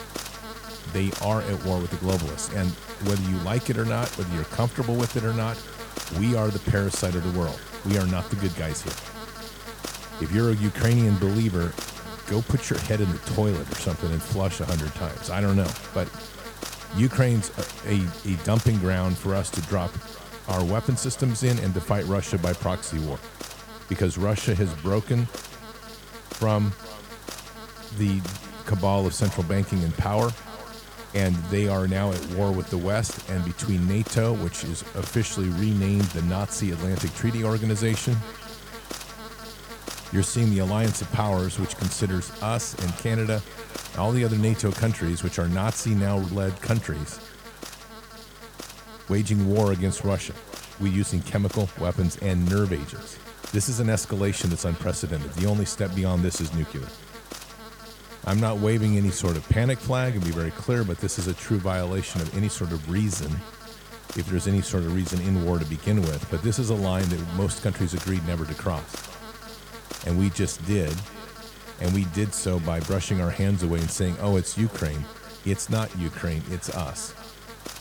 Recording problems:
echo of what is said; faint; throughout; 410 ms later, 25 dB below the speech
electrical hum; loud; throughout; 50 Hz, 8 dB below the speech

